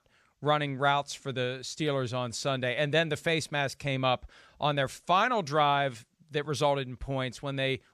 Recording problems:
none

